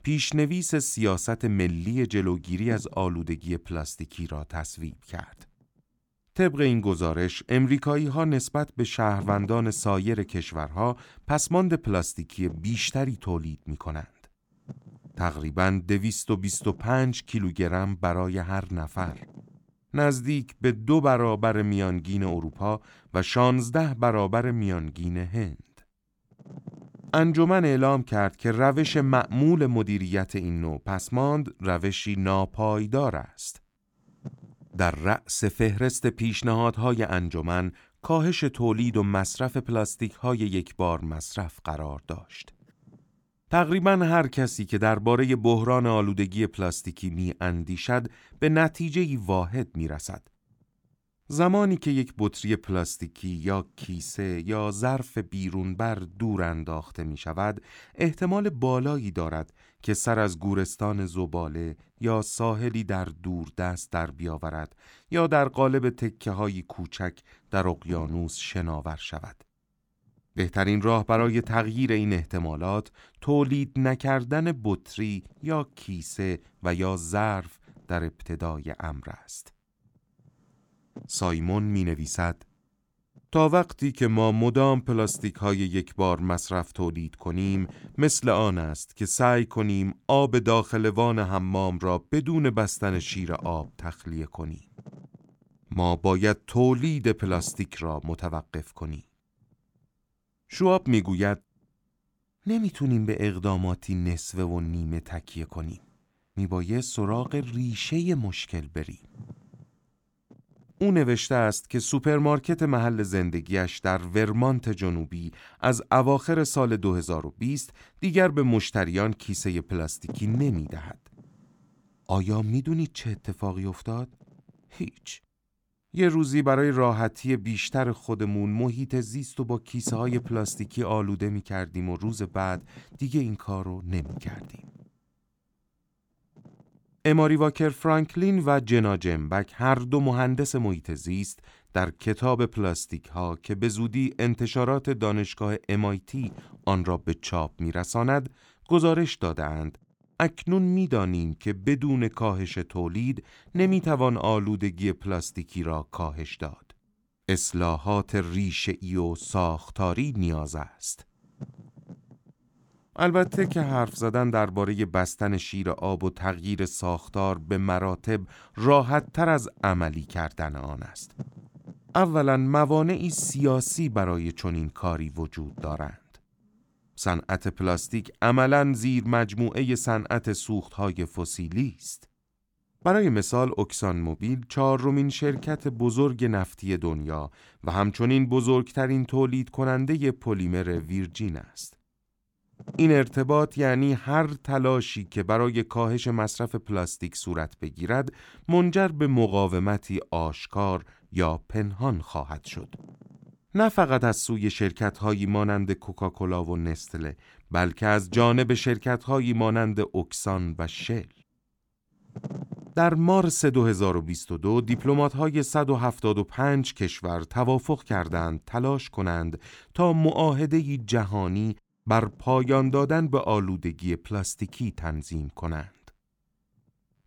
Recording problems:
wind noise on the microphone; occasional gusts; 25 dB below the speech

